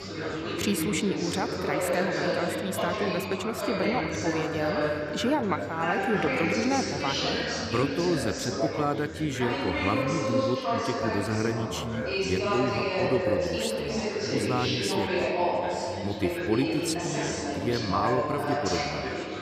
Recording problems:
chatter from many people; very loud; throughout; 2 dB above the speech

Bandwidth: 14.5 kHz